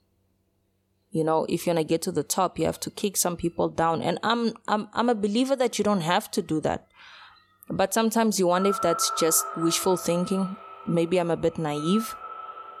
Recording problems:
echo of what is said; strong; from 8.5 s on; 140 ms later, 9 dB below the speech

